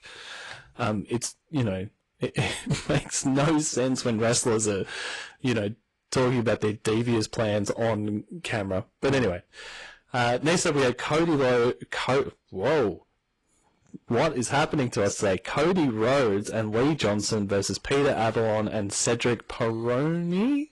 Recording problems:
distortion; heavy; 15% of the sound clipped
garbled, watery; slightly

